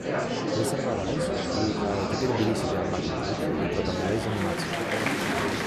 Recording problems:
murmuring crowd; very loud; throughout; 3 dB above the speech

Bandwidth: 13.5 kHz